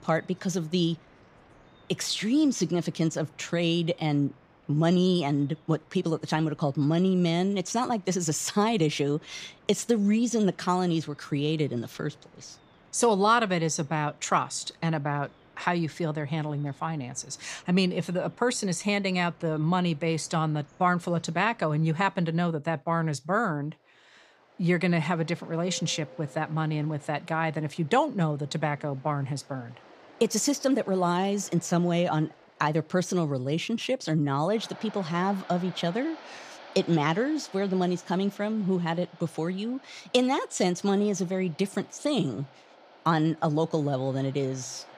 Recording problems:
rain or running water; faint; throughout; 25 dB below the speech

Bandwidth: 15 kHz